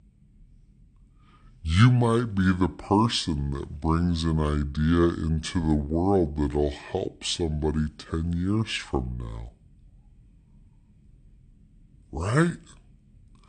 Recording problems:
wrong speed and pitch; too slow and too low; 0.7 times normal speed

